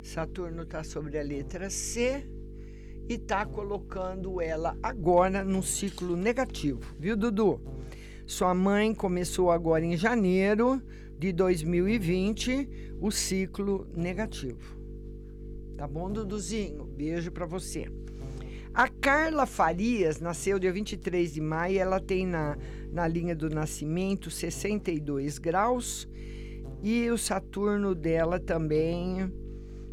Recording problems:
electrical hum; faint; throughout; 50 Hz, 20 dB below the speech

